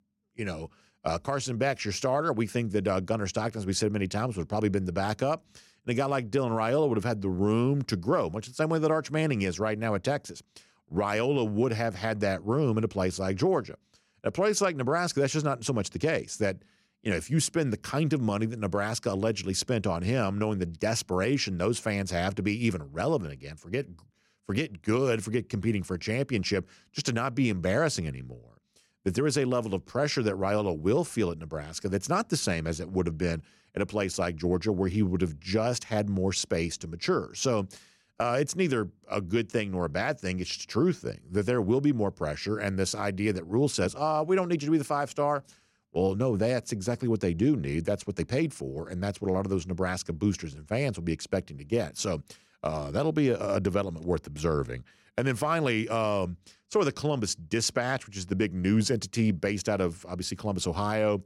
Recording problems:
none

